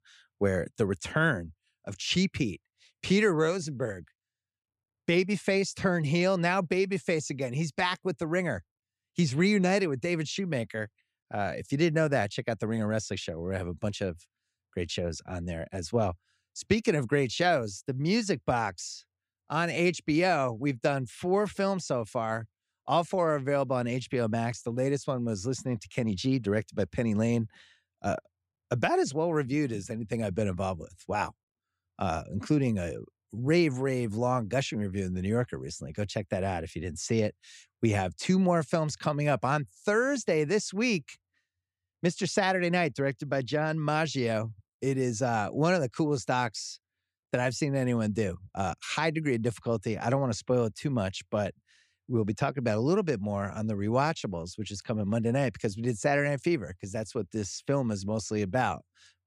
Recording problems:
none

